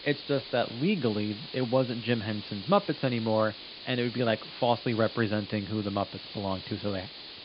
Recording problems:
high frequencies cut off; severe; nothing above 5 kHz
hiss; noticeable; throughout; 10 dB below the speech

